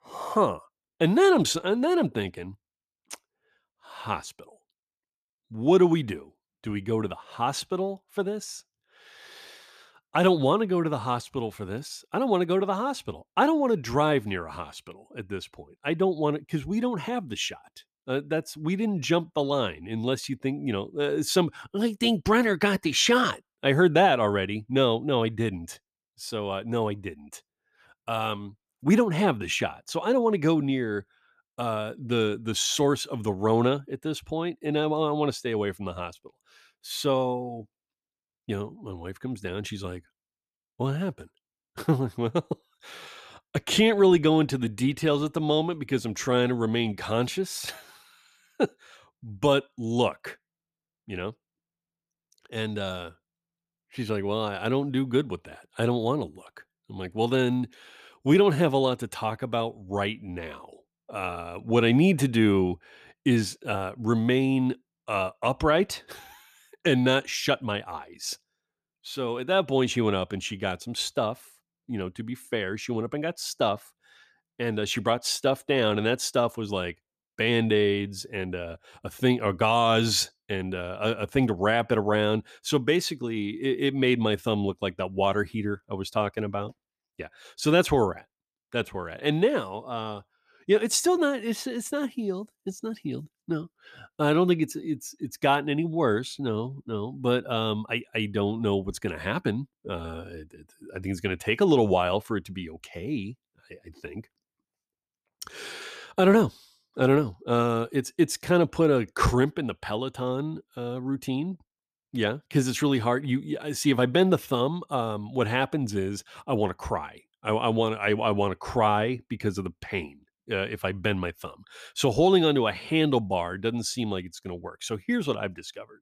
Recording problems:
uneven, jittery; slightly; from 1:17 to 1:40

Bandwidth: 14.5 kHz